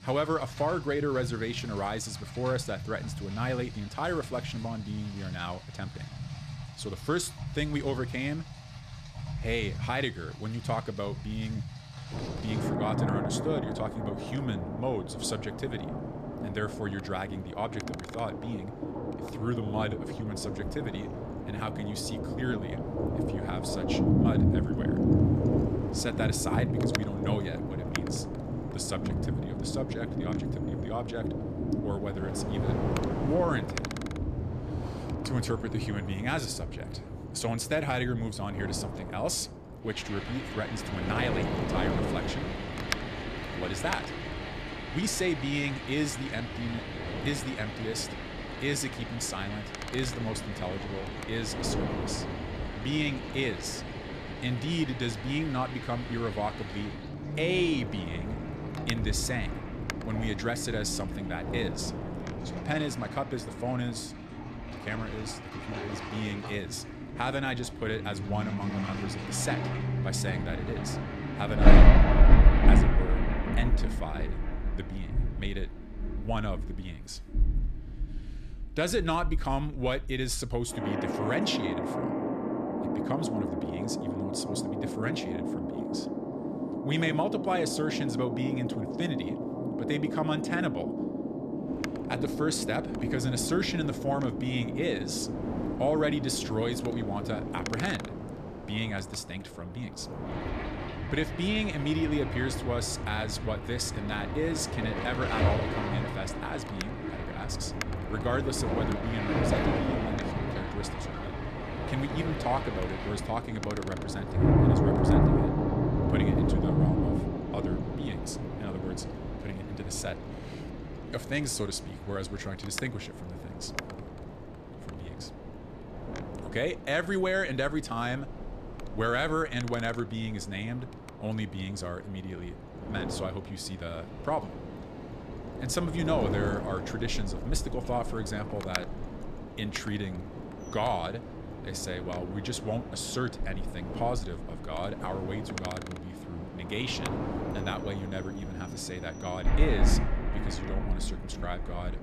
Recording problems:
rain or running water; very loud; throughout; 1 dB above the speech
wind noise on the microphone; heavy; from 12 s to 1:04 and from 1:32 on; 8 dB below the speech

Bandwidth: 14 kHz